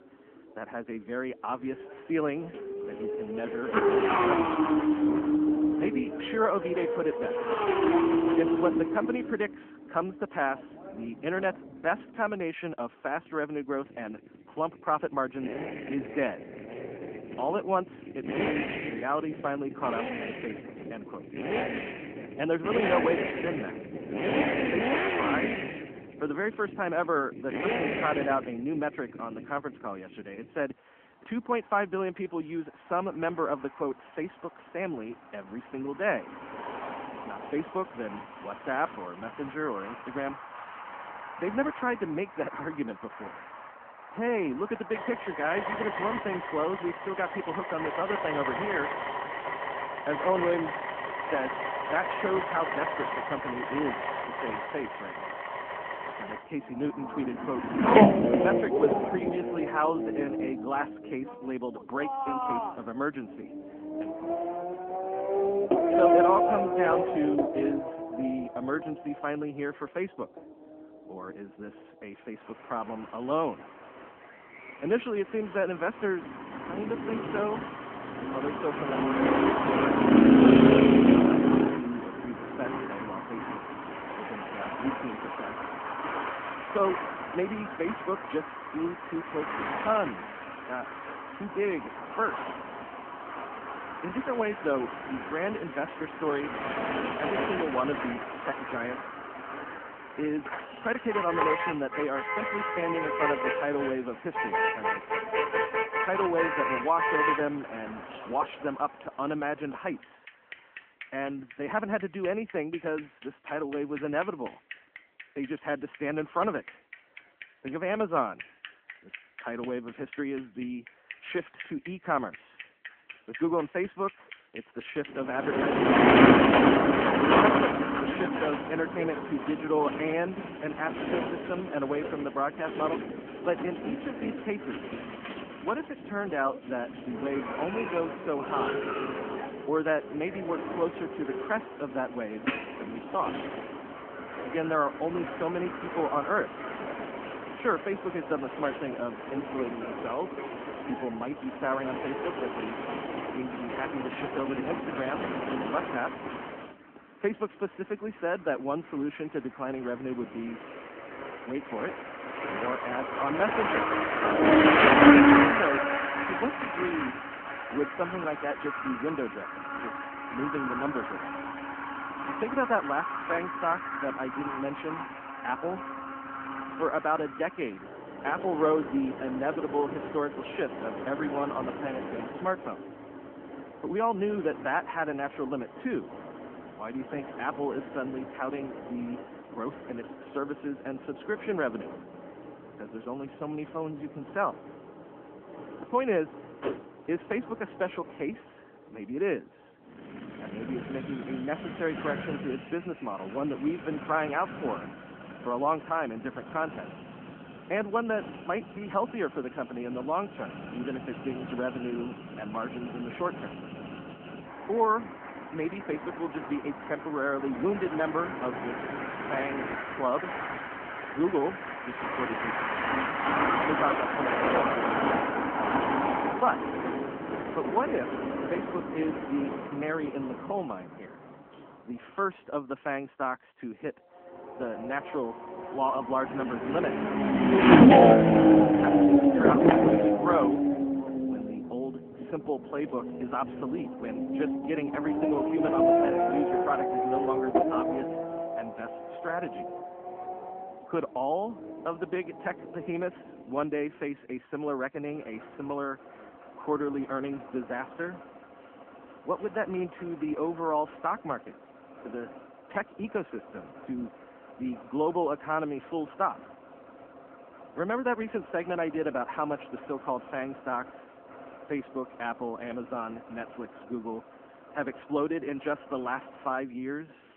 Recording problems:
phone-call audio
traffic noise; very loud; throughout; 5 dB above the speech

